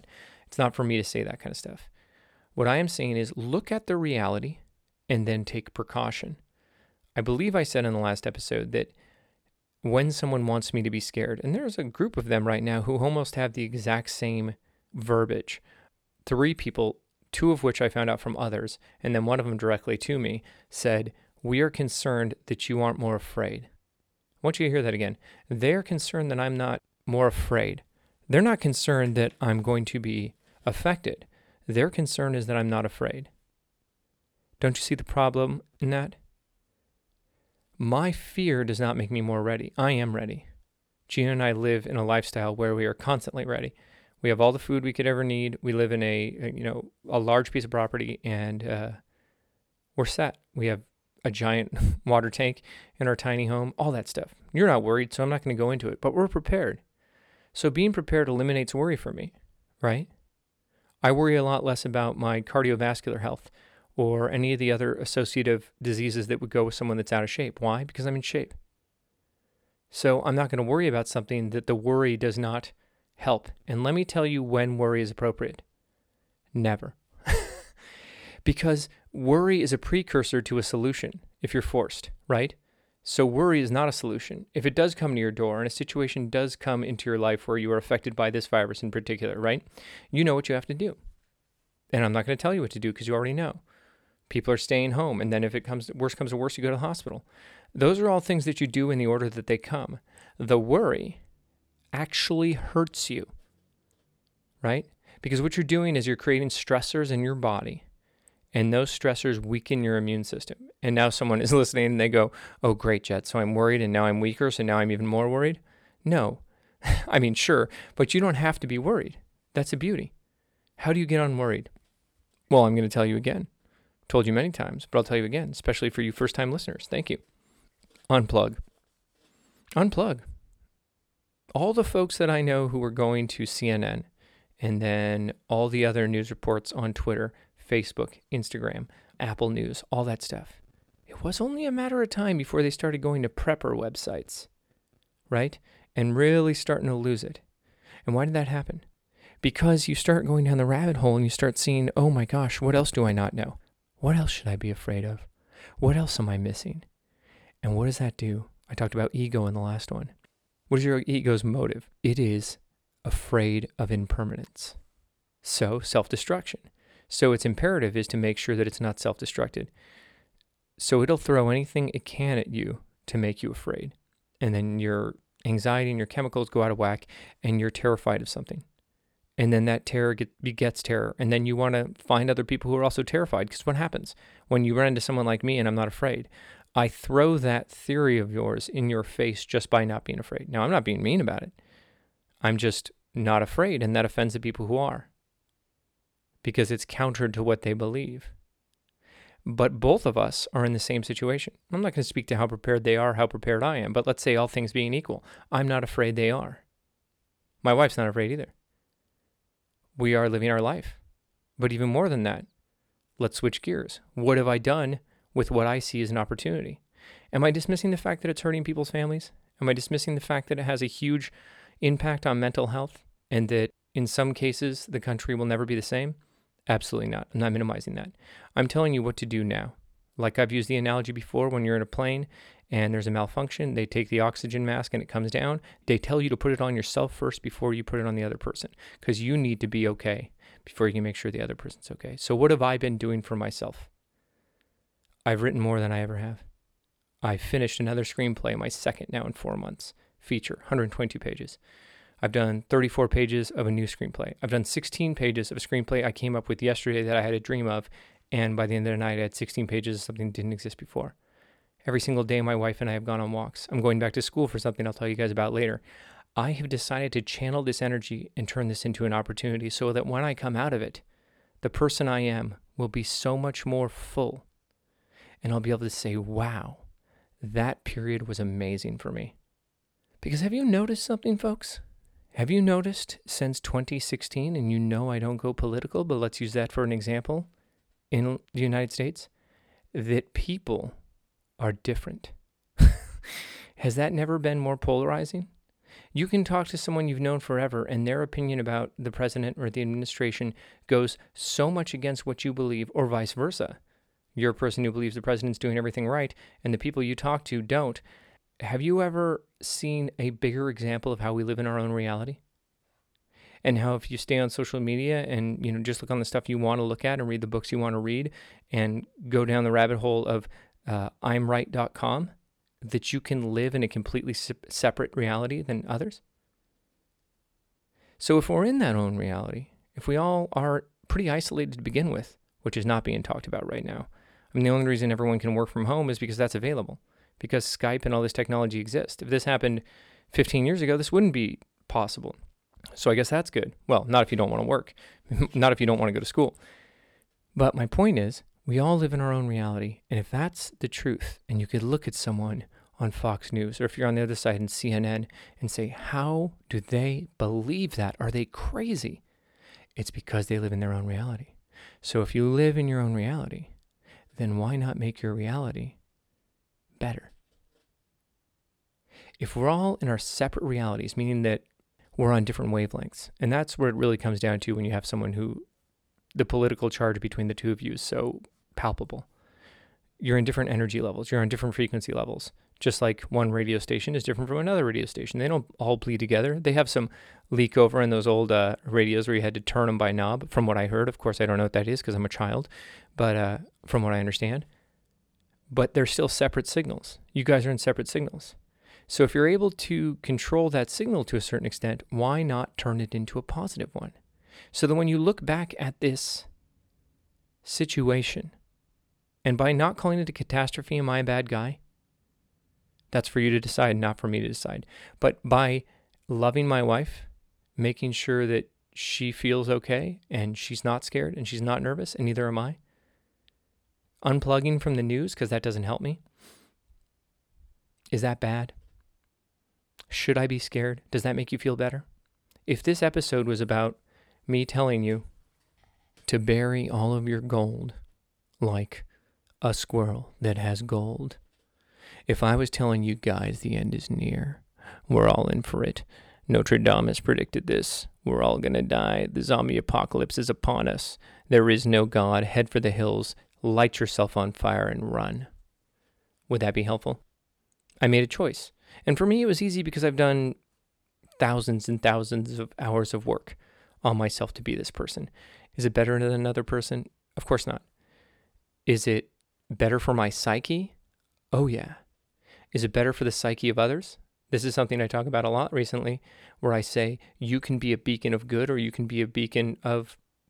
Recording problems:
none

